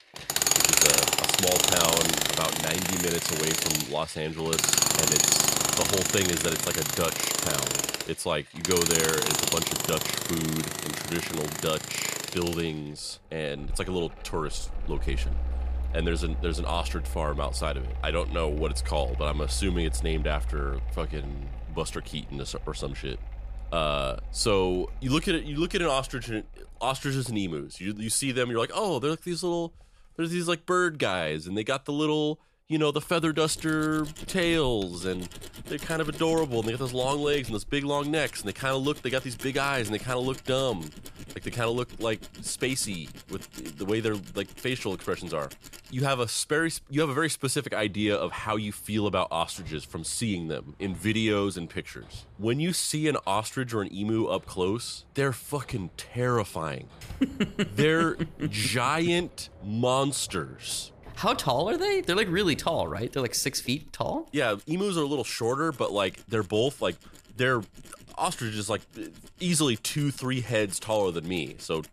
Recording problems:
machinery noise; very loud; throughout; 2 dB above the speech

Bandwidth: 14.5 kHz